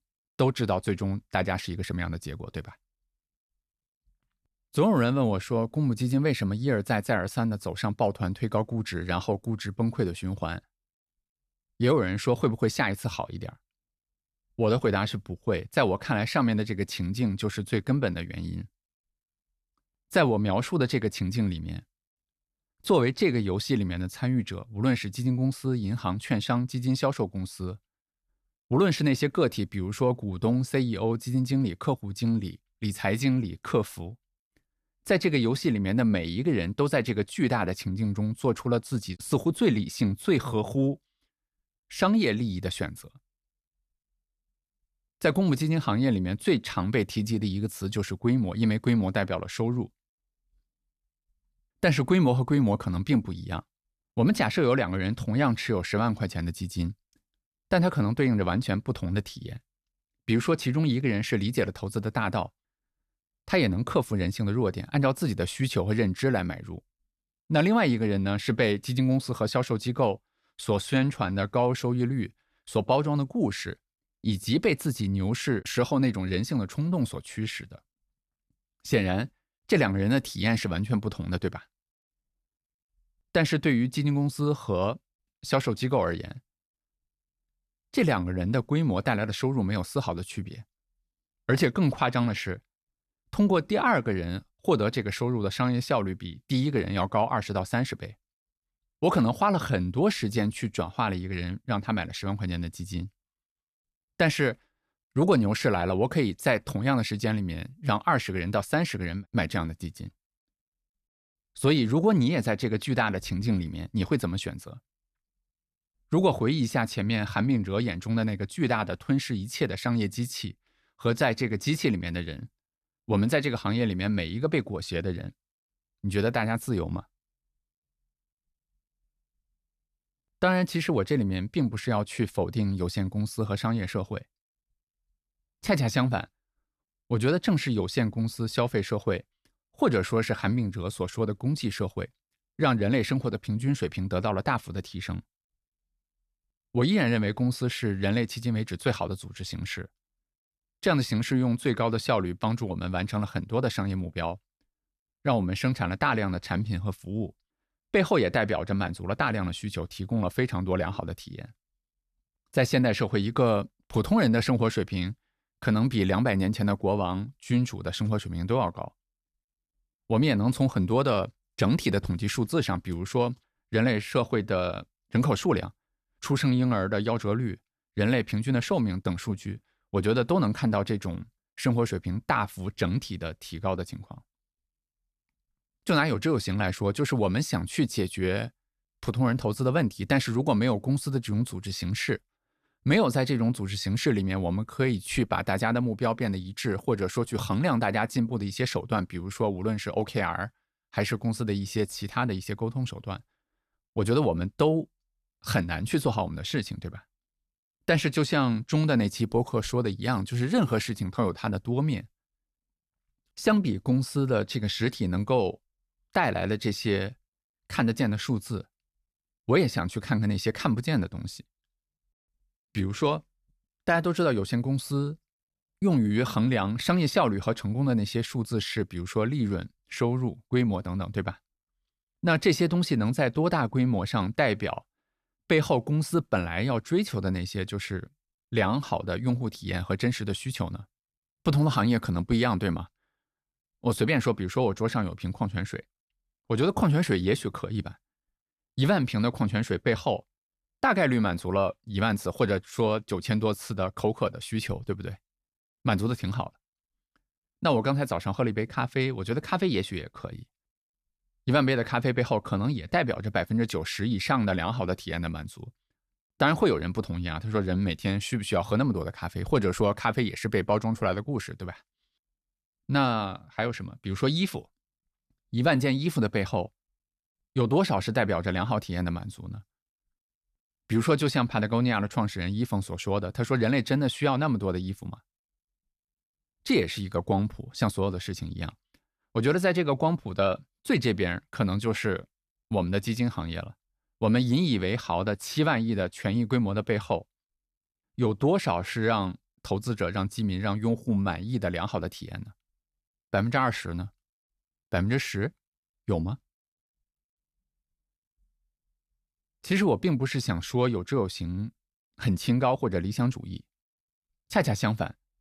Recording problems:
none

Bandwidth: 14.5 kHz